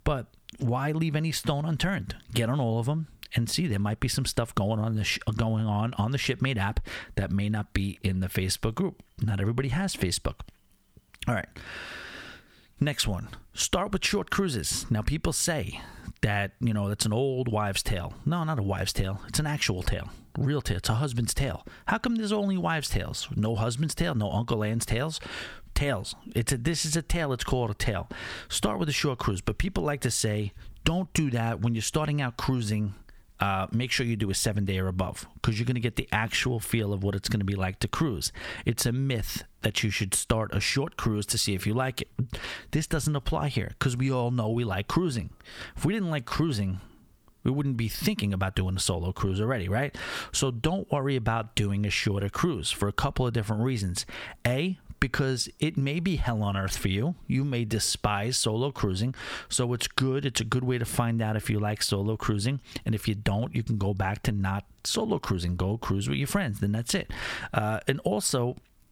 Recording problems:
squashed, flat; somewhat

